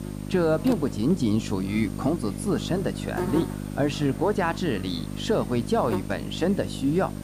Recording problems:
electrical hum; noticeable; throughout; 50 Hz, 10 dB below the speech
murmuring crowd; faint; throughout; 25 dB below the speech
hiss; faint; throughout; 25 dB below the speech

